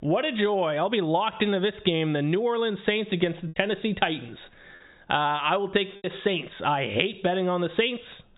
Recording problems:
high frequencies cut off; severe; nothing above 4 kHz
squashed, flat; heavily
choppy; occasionally; at 6 s; 2% of the speech affected

